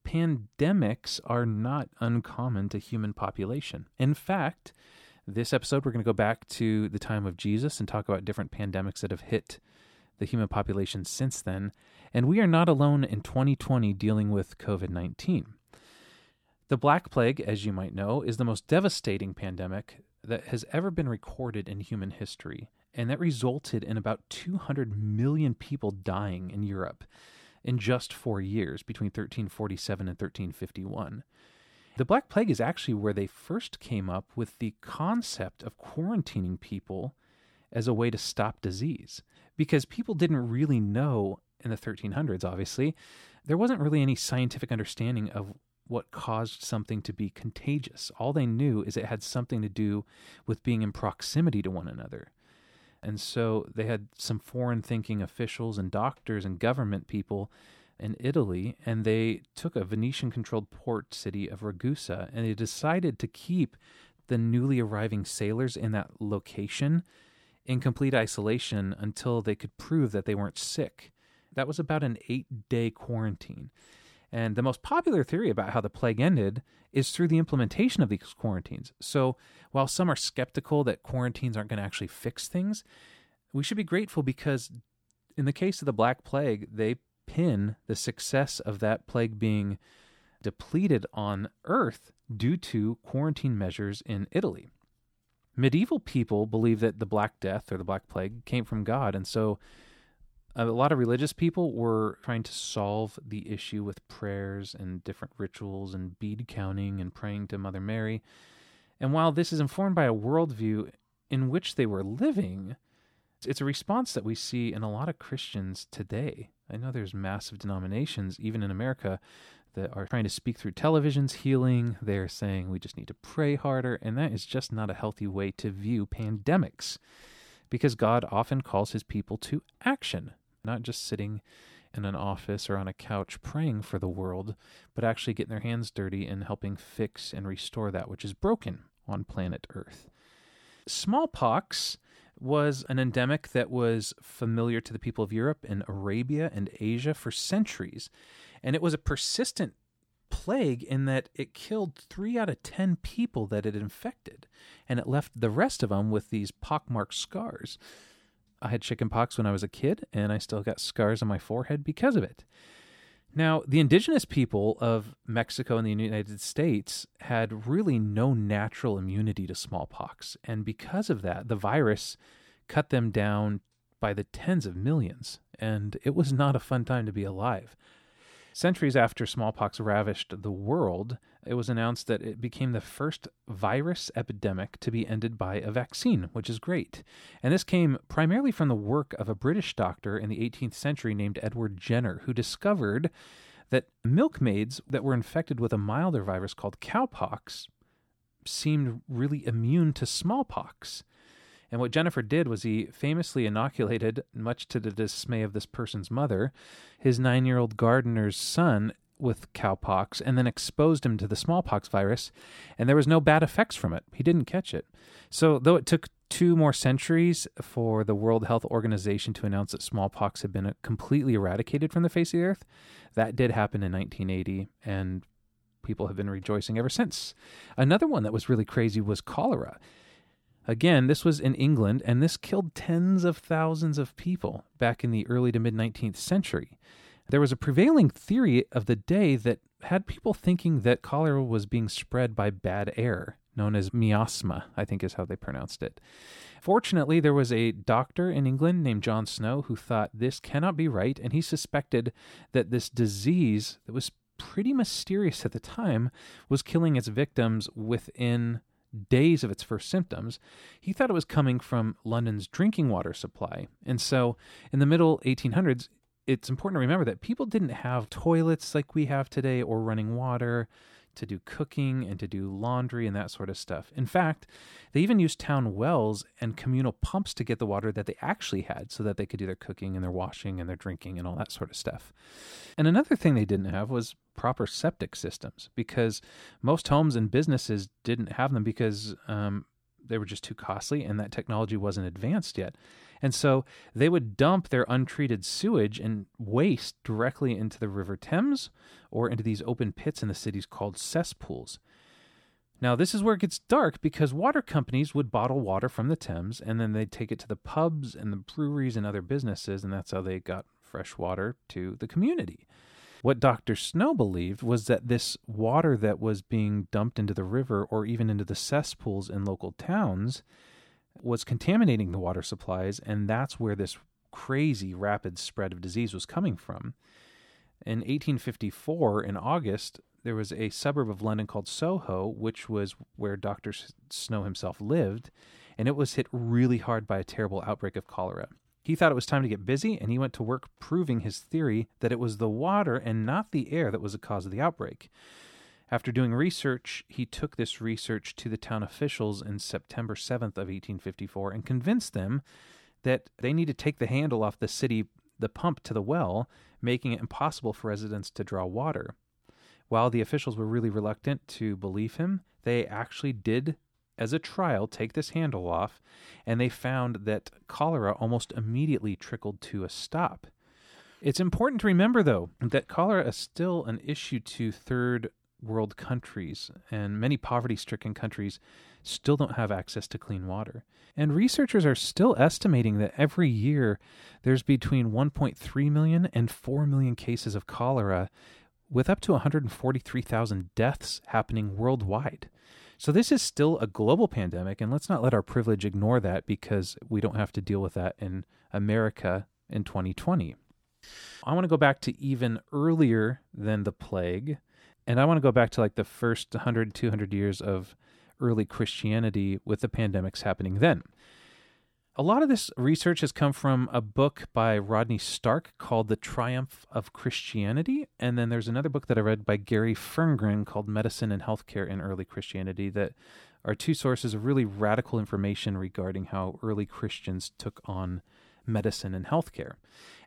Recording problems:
none

